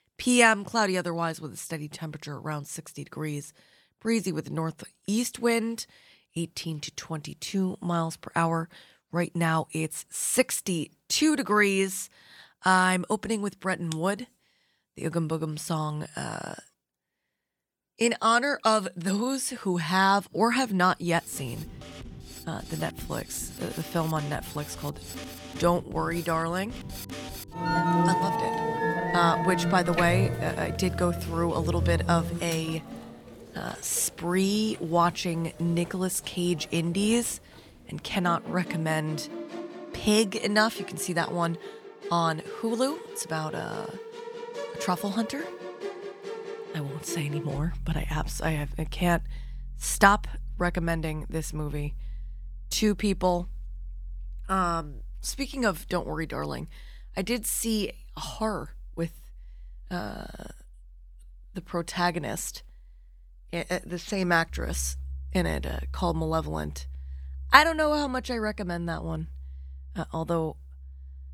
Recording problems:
background music; loud; from 21 s on; 8 dB below the speech

